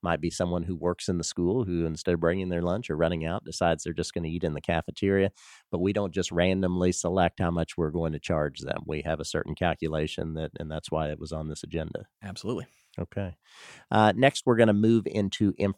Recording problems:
none

